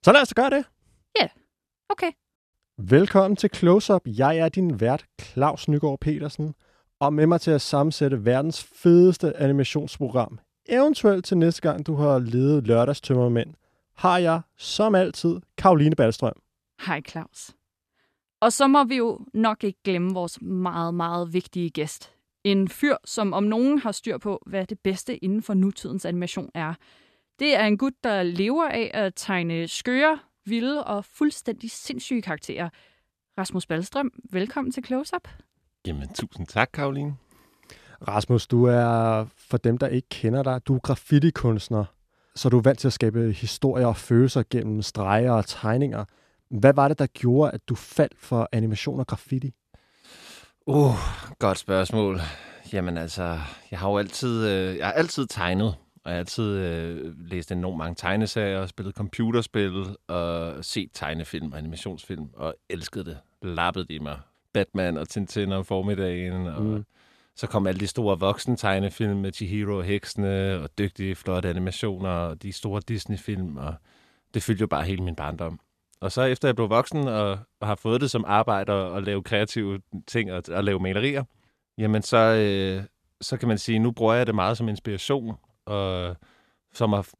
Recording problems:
none

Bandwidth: 14 kHz